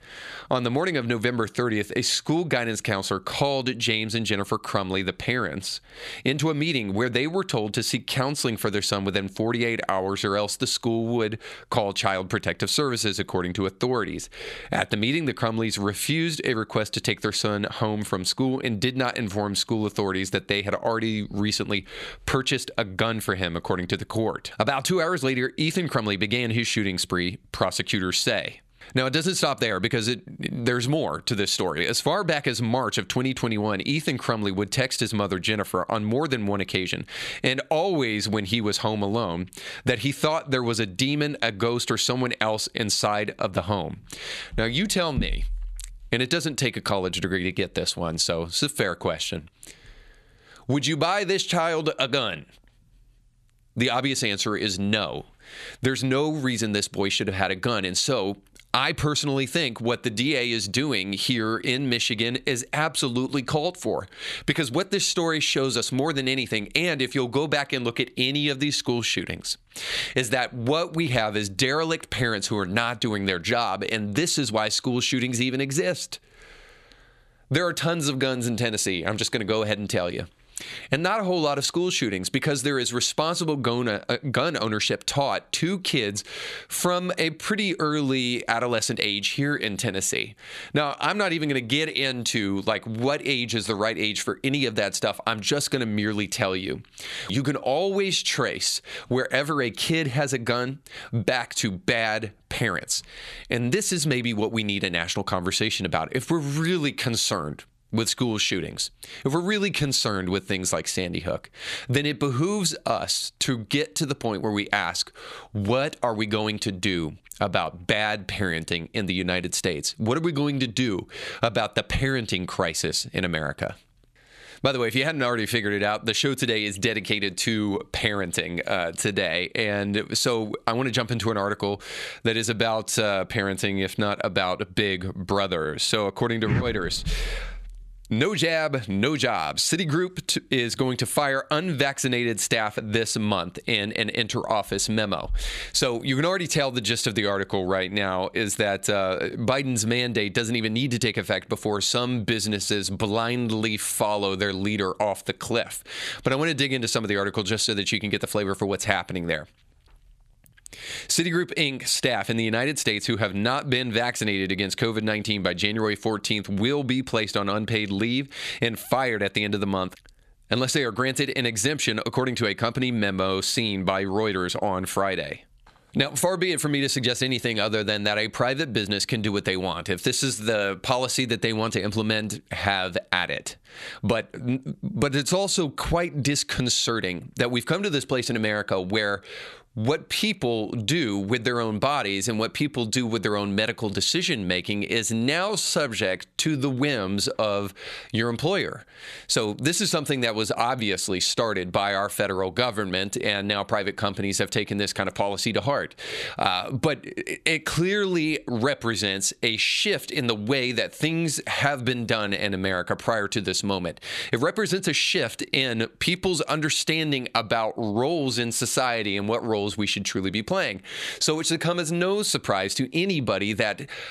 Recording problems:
squashed, flat; somewhat

